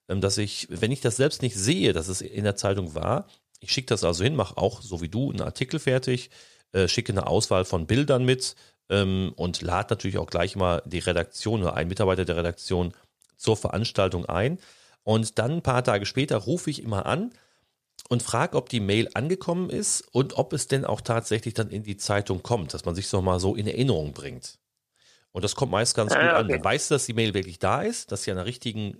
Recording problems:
none

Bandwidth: 14.5 kHz